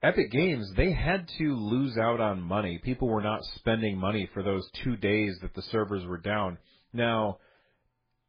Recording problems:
garbled, watery; badly; nothing above 4 kHz

